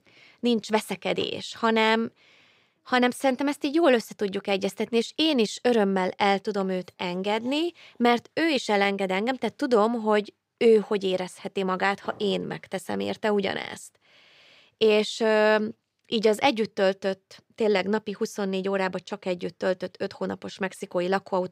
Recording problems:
none

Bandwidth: 15.5 kHz